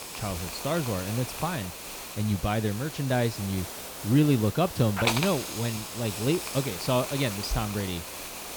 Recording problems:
hiss; loud; throughout; 6 dB below the speech

